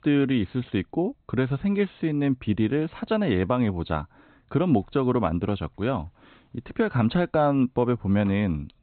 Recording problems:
high frequencies cut off; severe; nothing above 4 kHz

